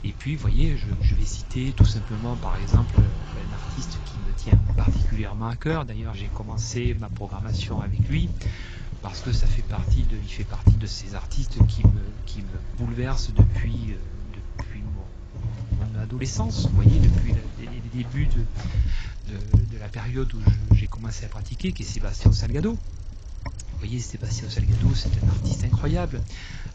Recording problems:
garbled, watery; badly; nothing above 7.5 kHz
wind noise on the microphone; heavy; 1 dB below the speech
traffic noise; noticeable; throughout; 15 dB below the speech

